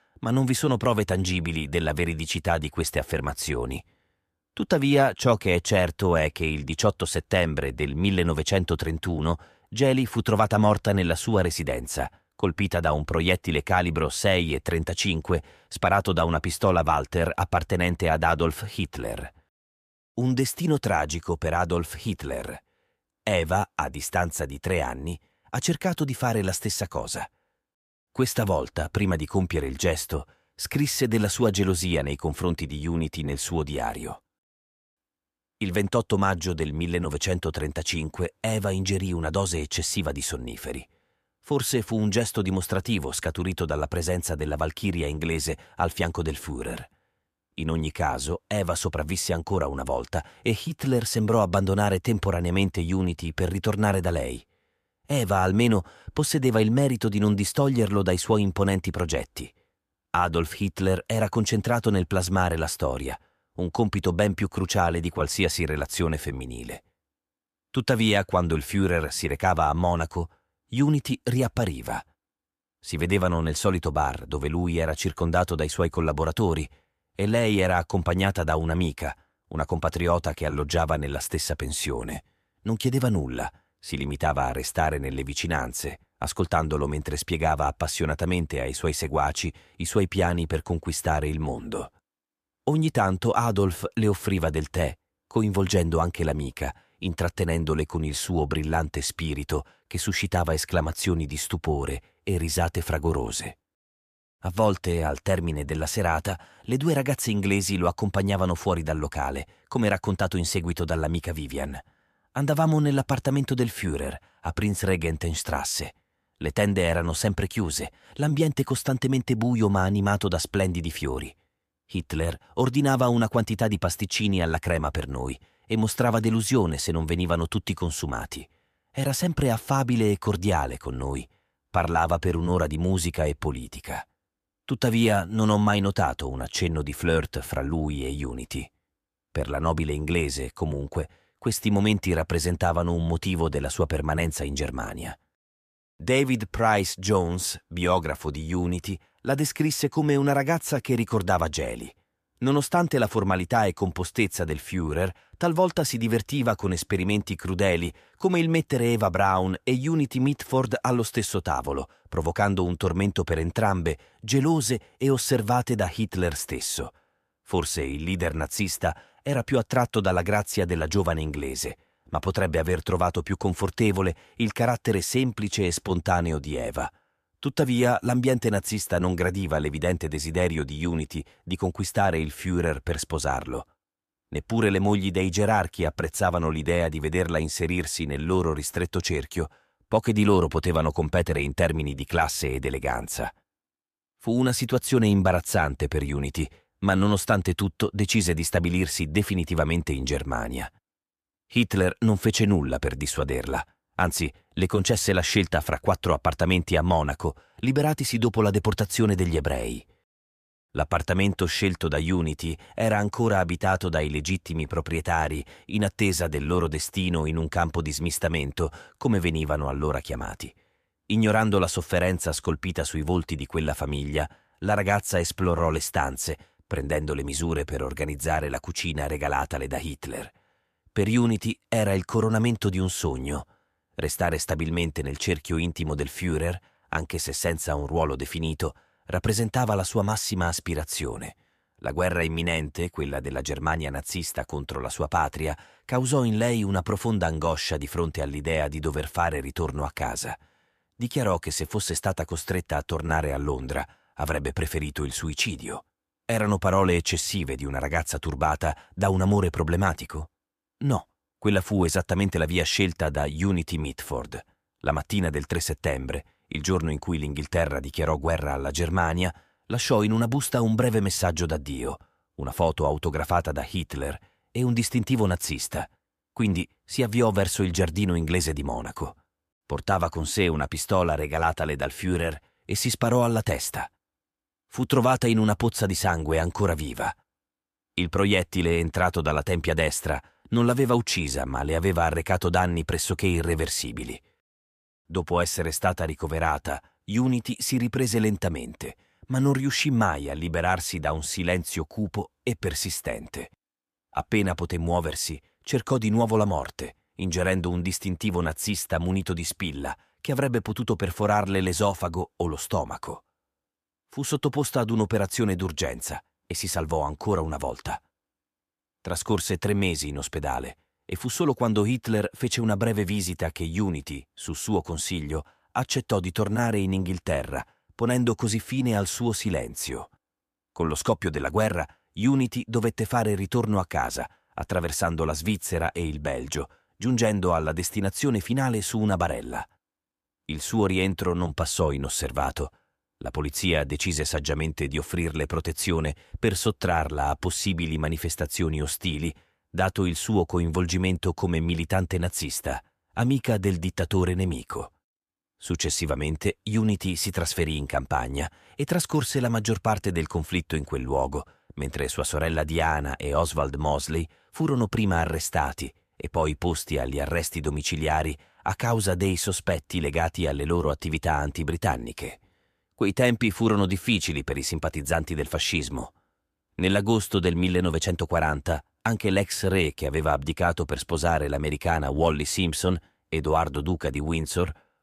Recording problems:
none

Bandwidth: 14.5 kHz